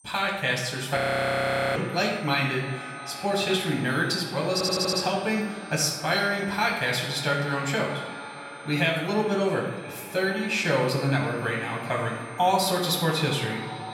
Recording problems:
off-mic speech; far
echo of what is said; noticeable; throughout; 320 ms later, 15 dB below the speech
room echo; noticeable; dies away in 0.9 s
high-pitched whine; faint; throughout; 8.5 kHz, 25 dB below the speech
audio freezing; at 1 s for 1 s
audio stuttering; at 4.5 s

